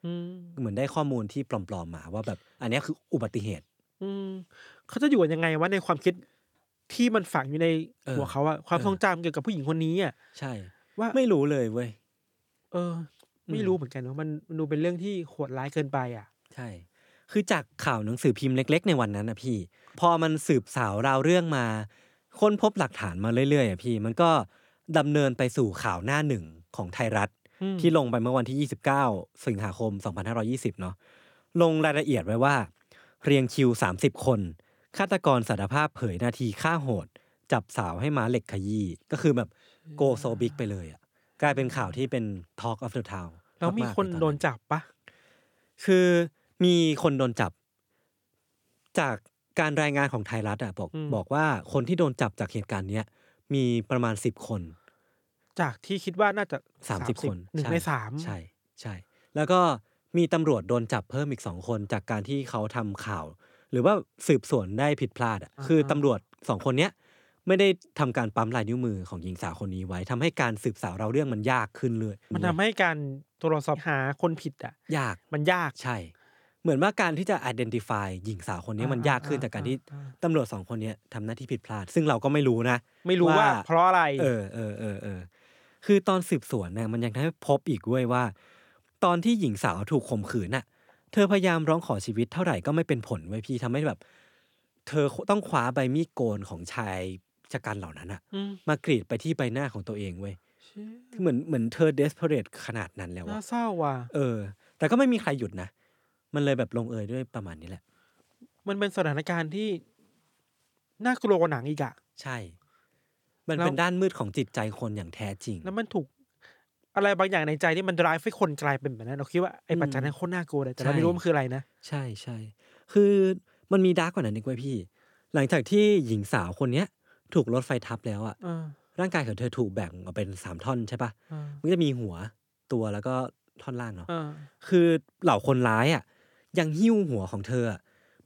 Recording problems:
none

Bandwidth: 18.5 kHz